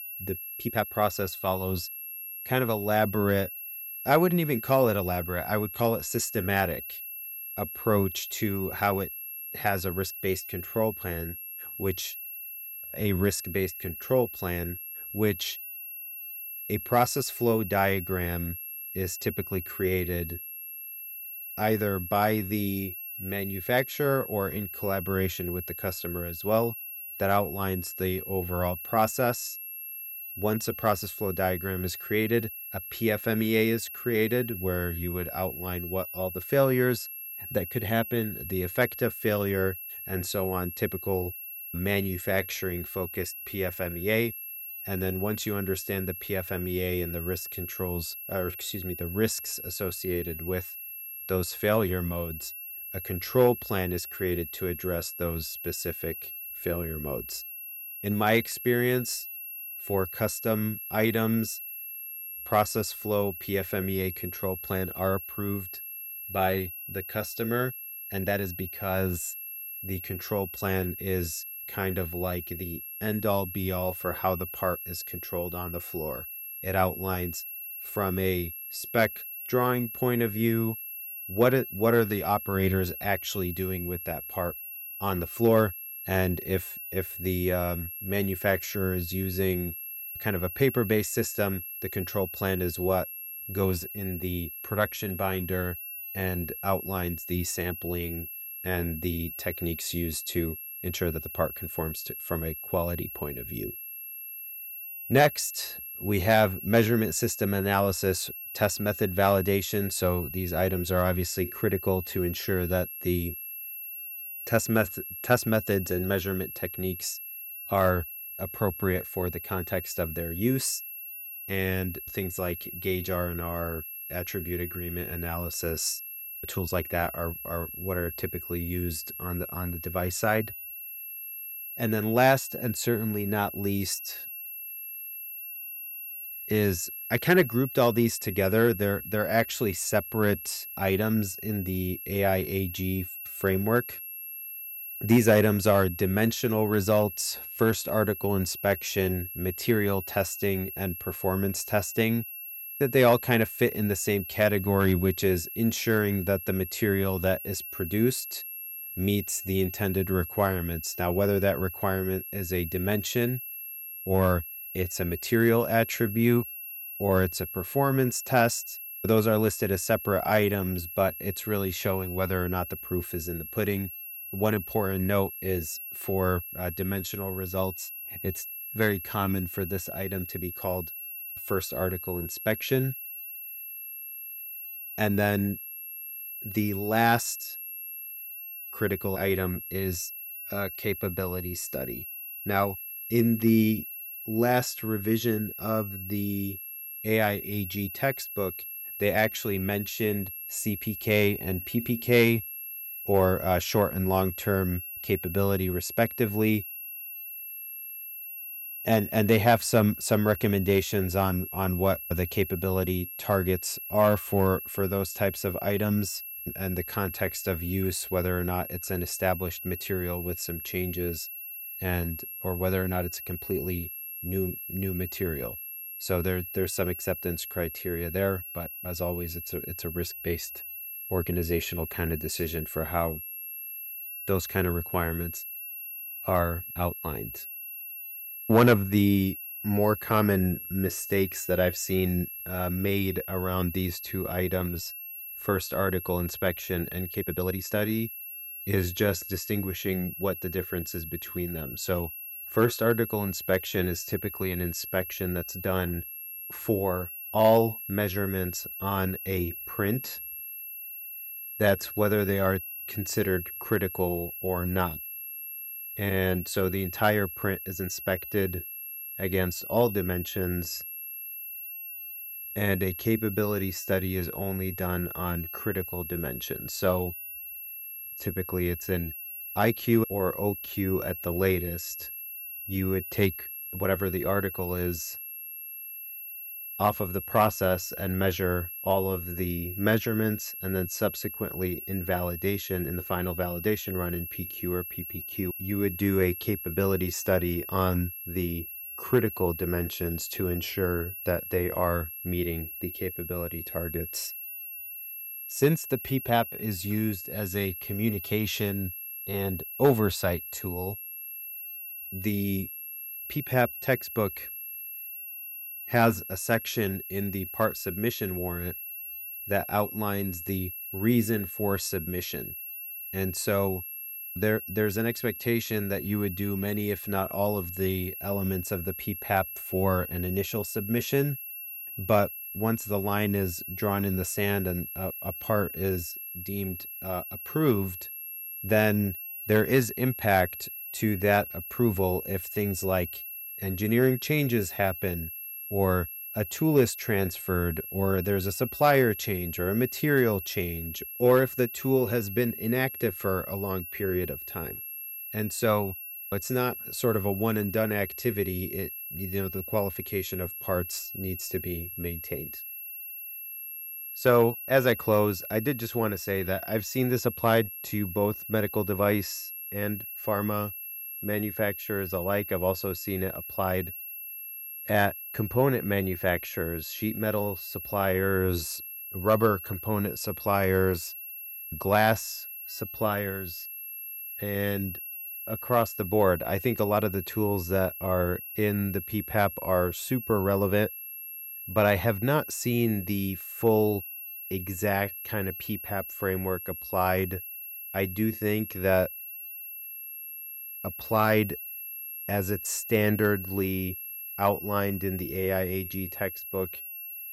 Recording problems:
high-pitched whine; loud; throughout; 11.5 kHz, 8 dB below the speech
uneven, jittery; strongly; from 0.5 s to 5:36

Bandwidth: 18.5 kHz